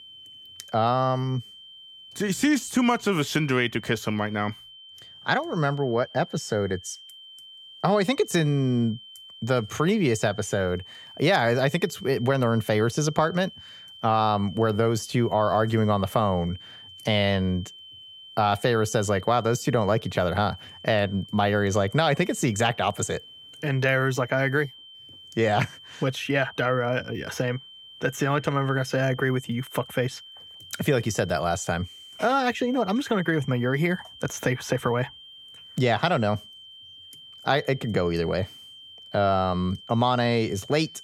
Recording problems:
high-pitched whine; noticeable; throughout; 3 kHz, 20 dB below the speech

